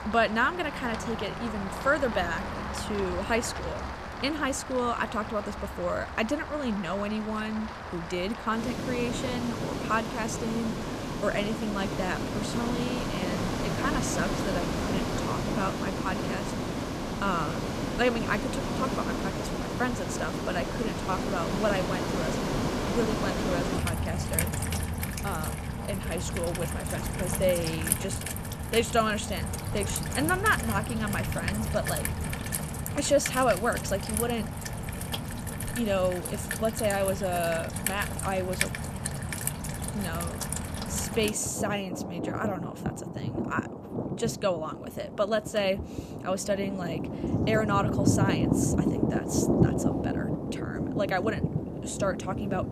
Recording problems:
rain or running water; loud; throughout; 1 dB below the speech

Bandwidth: 14.5 kHz